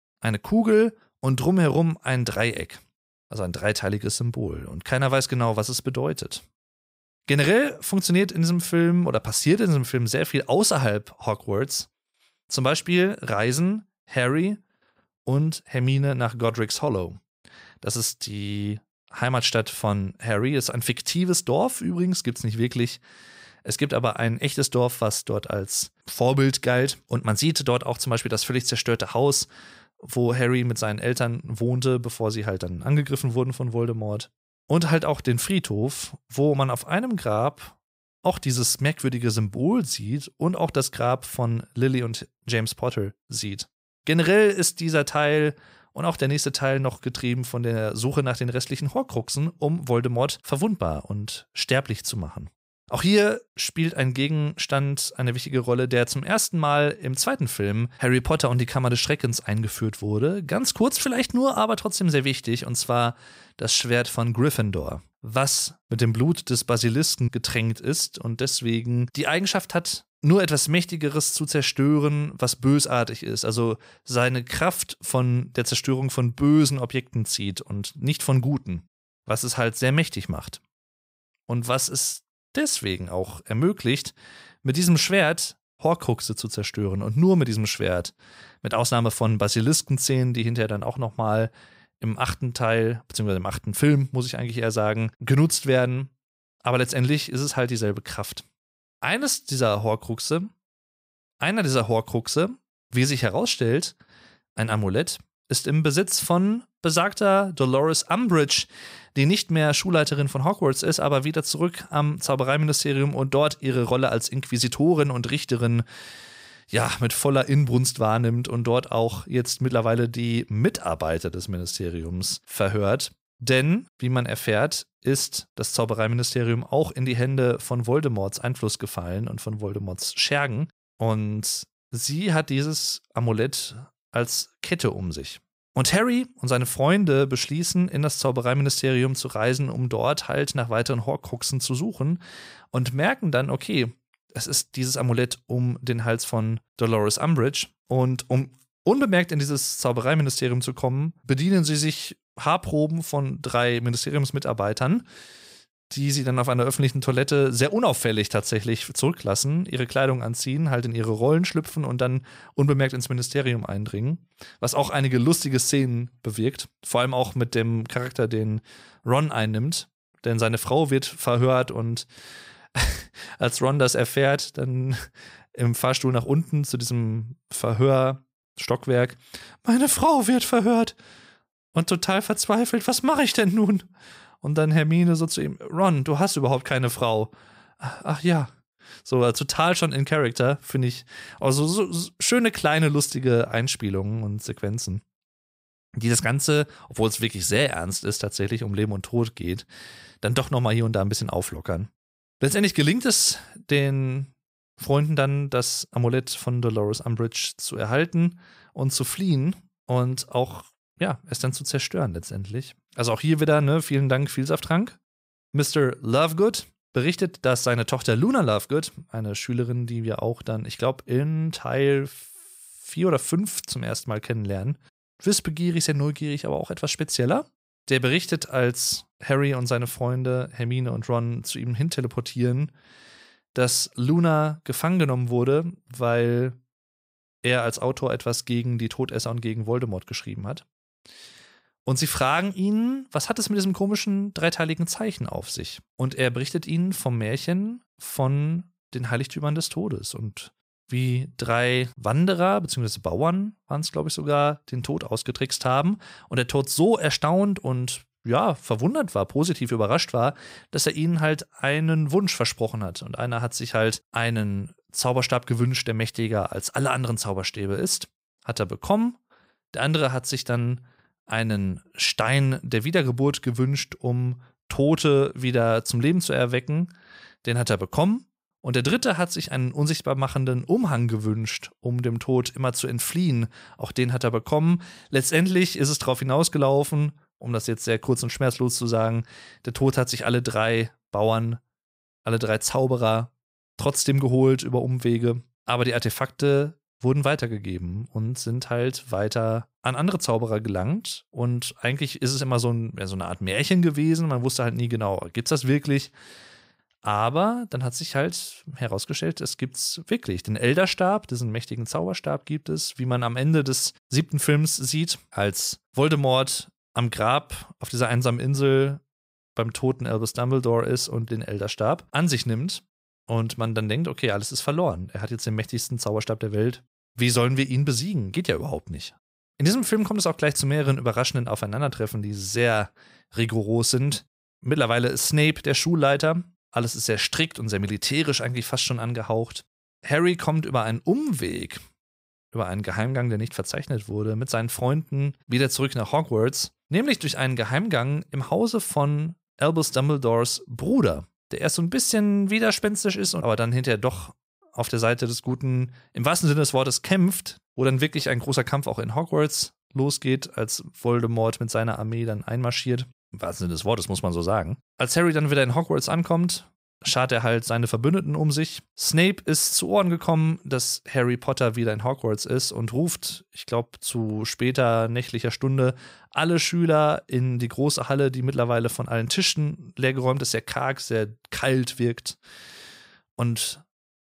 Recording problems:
none

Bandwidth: 15.5 kHz